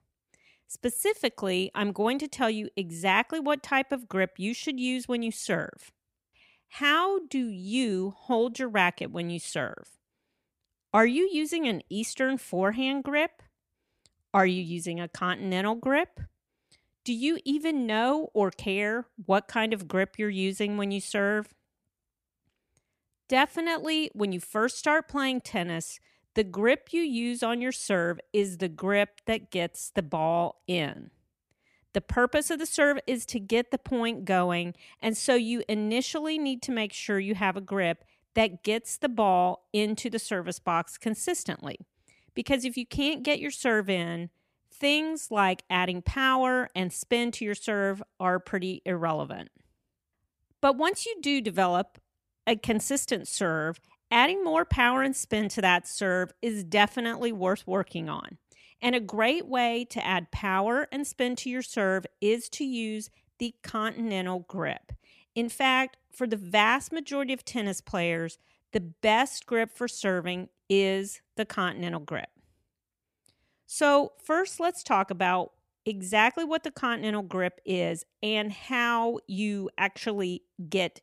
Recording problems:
none

